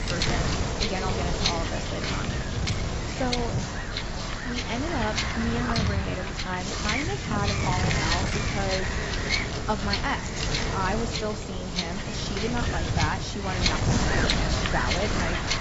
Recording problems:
garbled, watery; badly; nothing above 7.5 kHz
wind noise on the microphone; heavy; 4 dB above the speech
animal sounds; faint; throughout; 20 dB below the speech

